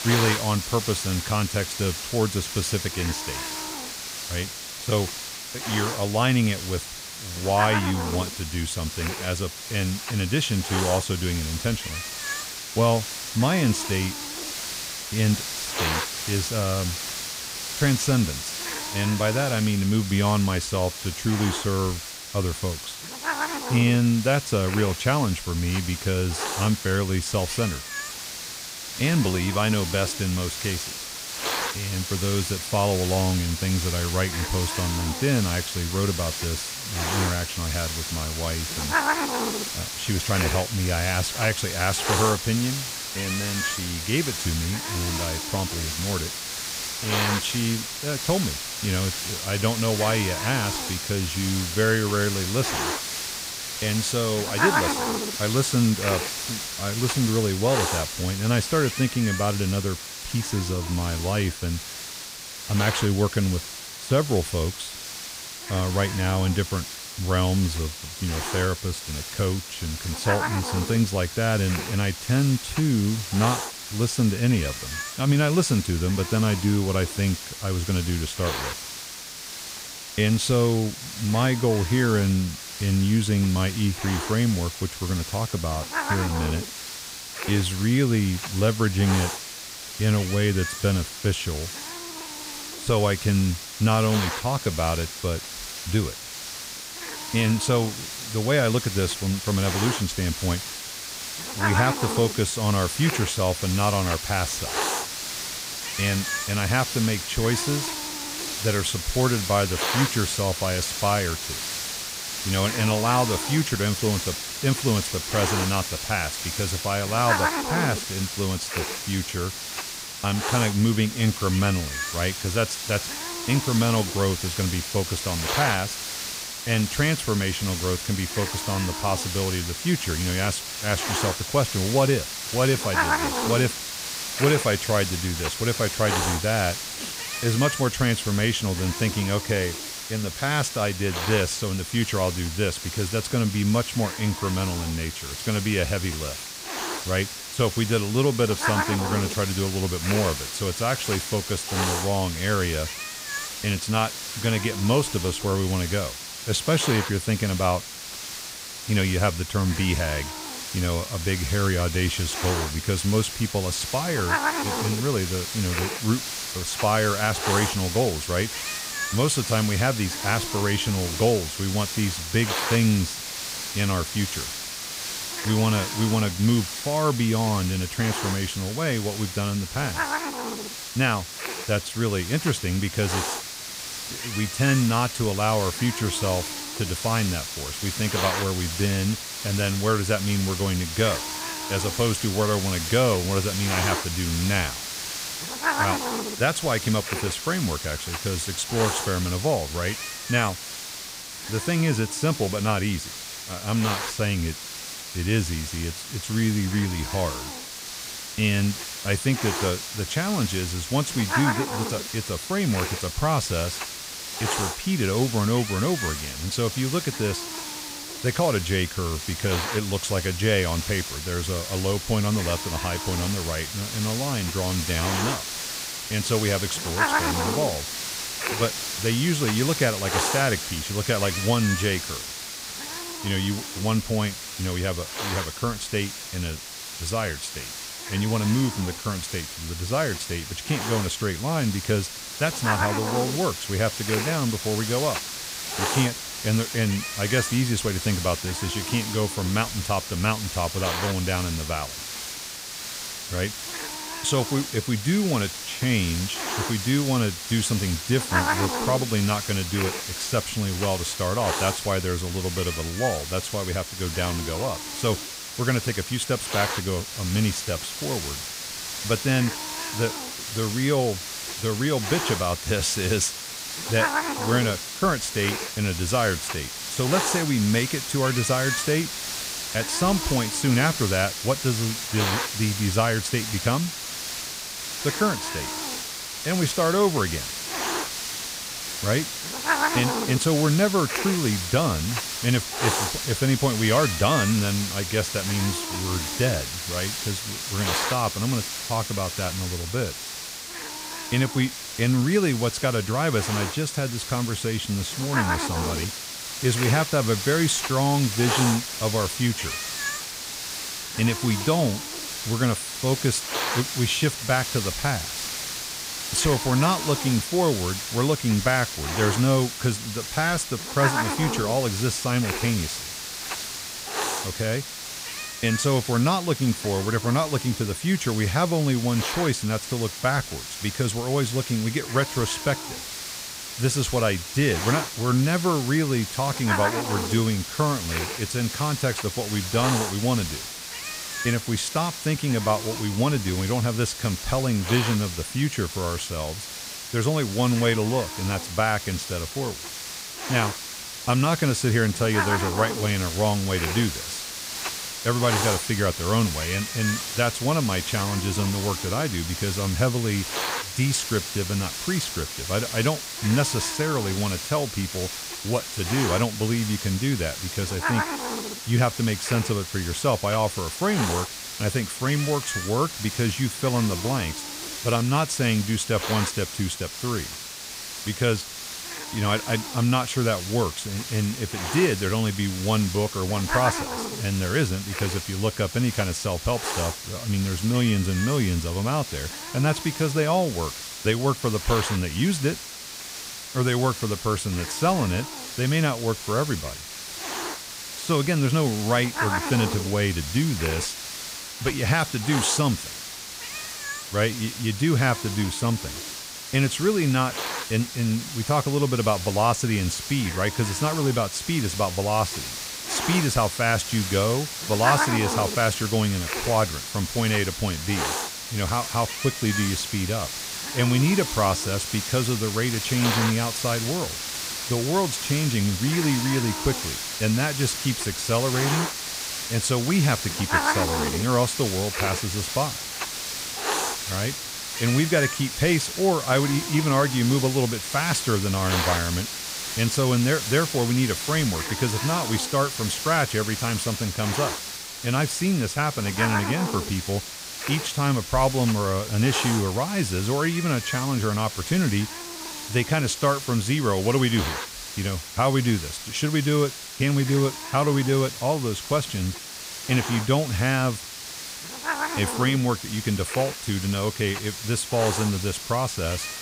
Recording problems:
hiss; loud; throughout; 4 dB below the speech

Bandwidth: 15.5 kHz